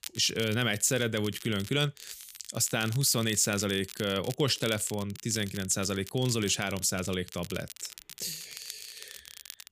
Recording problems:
crackle, like an old record; noticeable; 15 dB below the speech

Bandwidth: 15 kHz